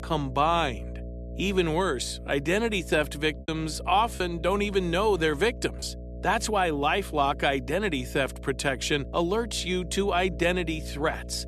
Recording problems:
electrical hum; faint; throughout; 60 Hz, 20 dB below the speech
choppy; occasionally; from 3.5 to 6 s; 5% of the speech affected

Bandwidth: 13.5 kHz